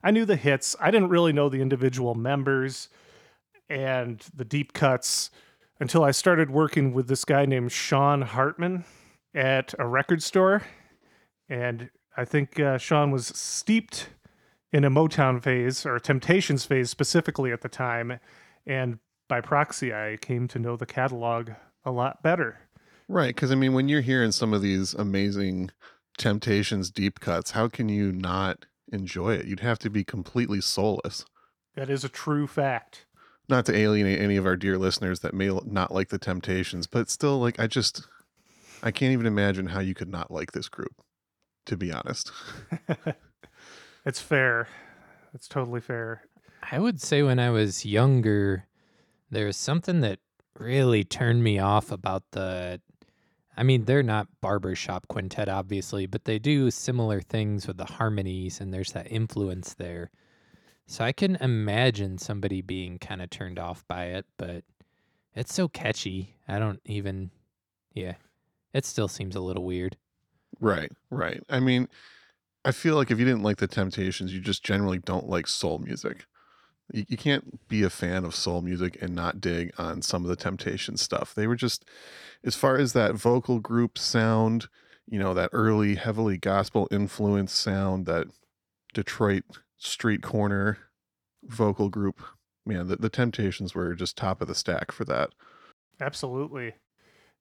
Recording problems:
none

